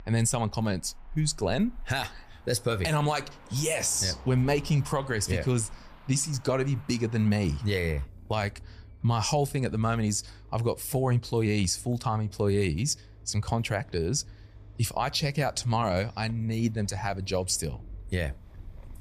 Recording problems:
traffic noise; faint; throughout; 20 dB below the speech

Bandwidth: 15 kHz